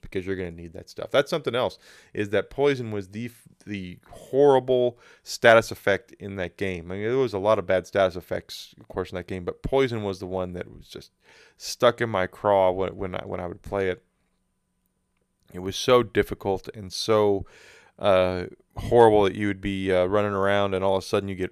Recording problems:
none

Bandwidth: 14.5 kHz